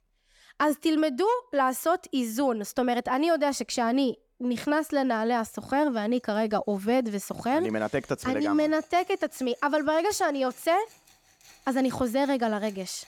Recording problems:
machinery noise; faint; throughout; 30 dB below the speech

